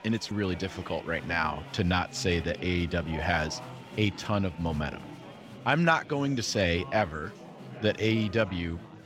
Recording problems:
chatter from many people; noticeable; throughout; 15 dB below the speech

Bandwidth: 16.5 kHz